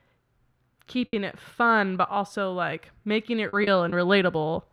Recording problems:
muffled; slightly; fading above 3.5 kHz
choppy; occasionally; 4% of the speech affected

